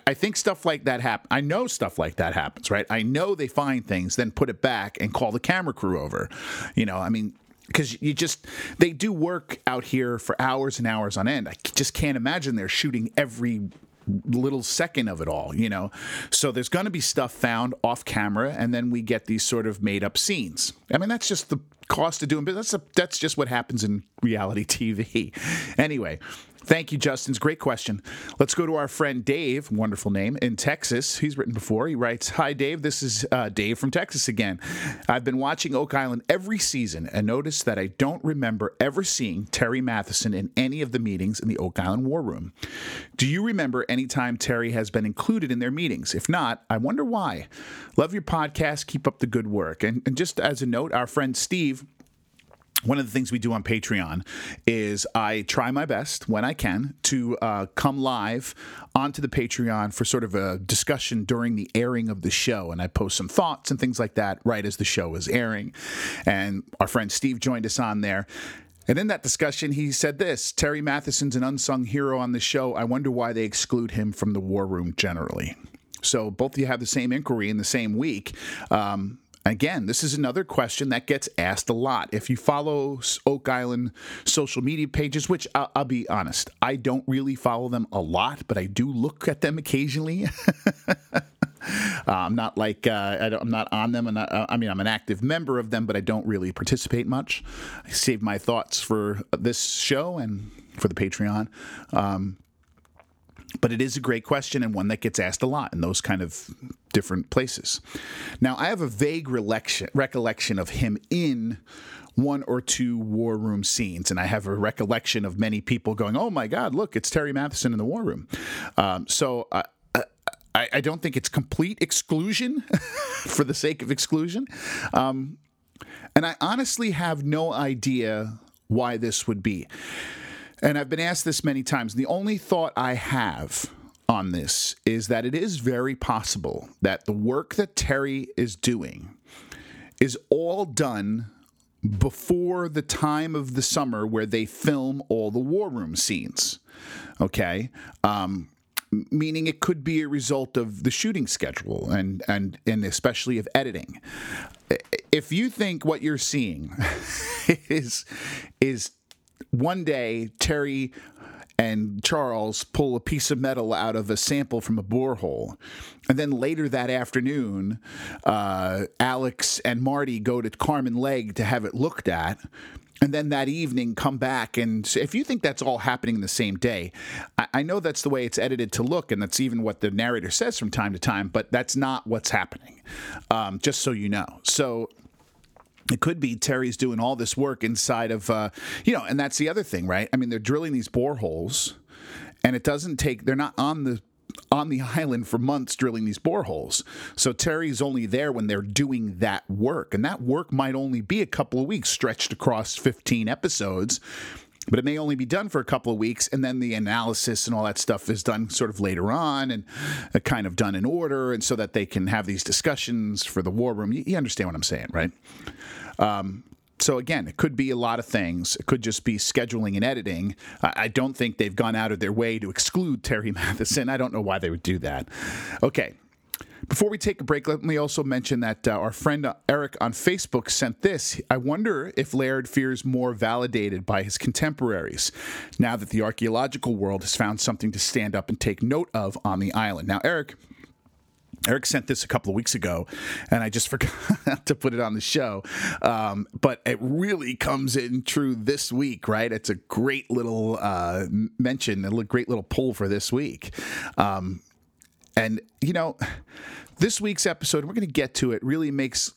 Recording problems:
squashed, flat; somewhat

